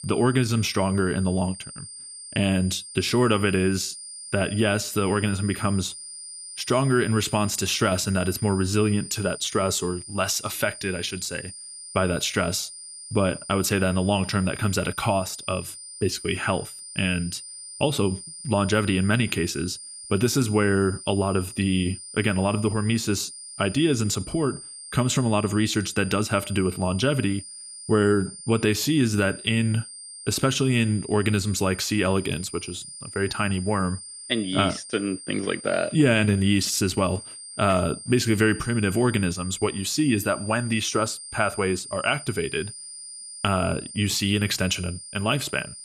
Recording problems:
high-pitched whine; noticeable; throughout; 9 kHz, 15 dB below the speech

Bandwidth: 14.5 kHz